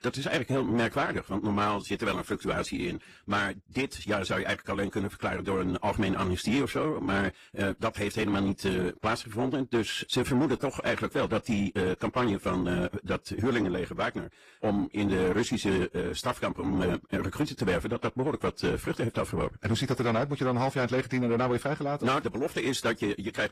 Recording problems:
wrong speed, natural pitch; too fast; 1.5 times normal speed
distortion; slight; 10 dB below the speech
garbled, watery; slightly; nothing above 14.5 kHz

